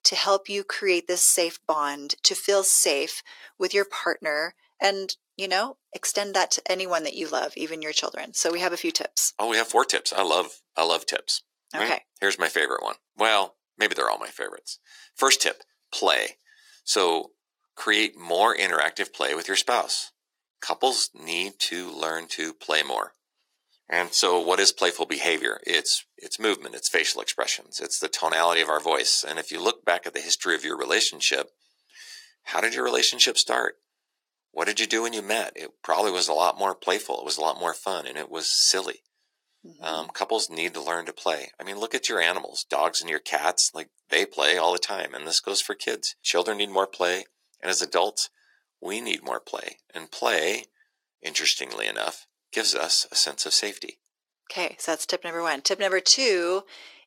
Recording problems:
thin; very; fading below 350 Hz

